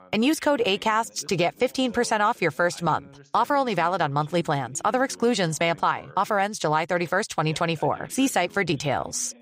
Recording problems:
background chatter; faint; throughout; 2 voices, 25 dB below the speech

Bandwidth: 15.5 kHz